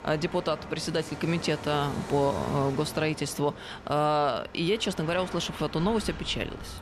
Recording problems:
train or aircraft noise; noticeable; throughout; 10 dB below the speech

